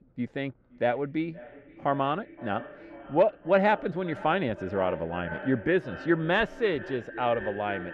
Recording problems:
muffled; very; fading above 2 kHz
echo of what is said; noticeable; throughout; 520 ms later, 15 dB below the speech

